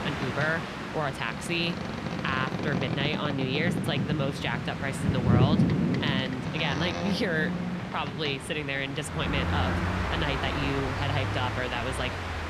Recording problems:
train or aircraft noise; very loud; throughout; 1 dB above the speech
chatter from many people; very faint; throughout; 30 dB below the speech

